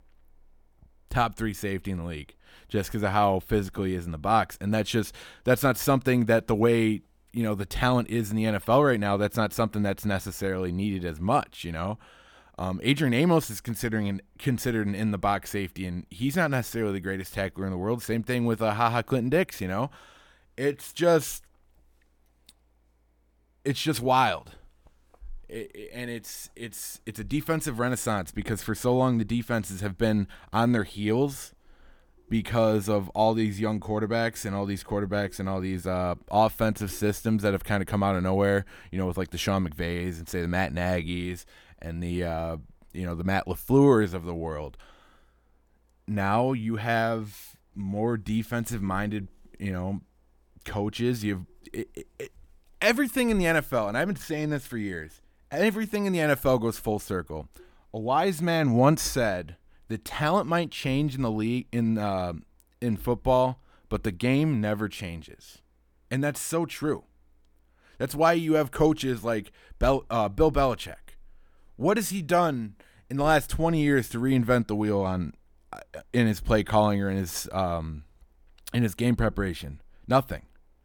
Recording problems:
none

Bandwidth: 18.5 kHz